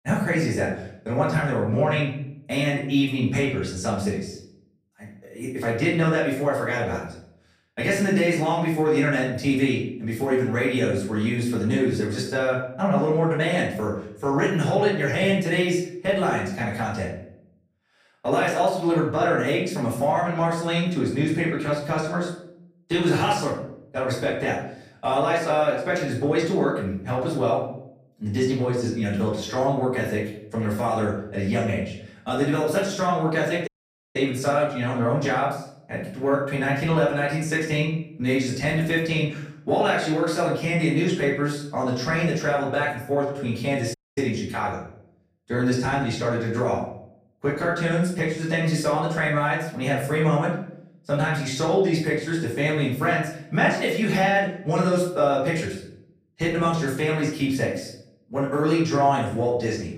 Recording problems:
off-mic speech; far
room echo; noticeable; dies away in 0.6 s
audio cutting out; at 34 s and at 44 s

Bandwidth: 15 kHz